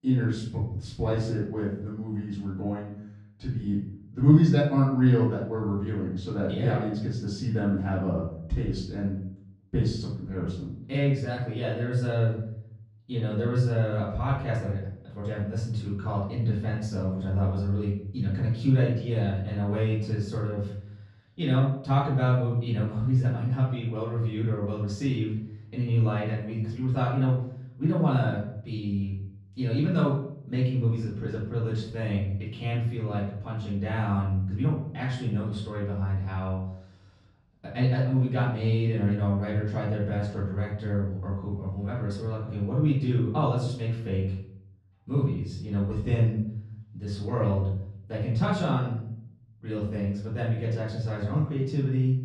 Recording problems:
off-mic speech; far
room echo; noticeable; dies away in 0.6 s
muffled; slightly; fading above 2 kHz

